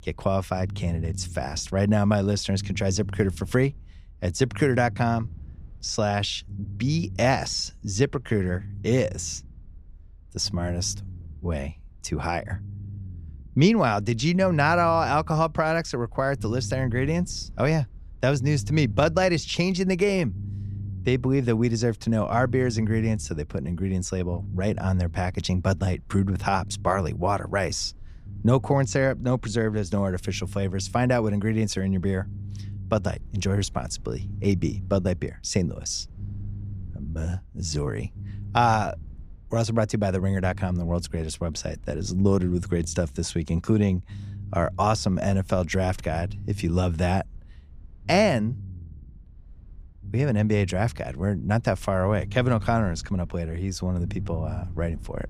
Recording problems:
low rumble; faint; throughout; 25 dB below the speech

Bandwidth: 15 kHz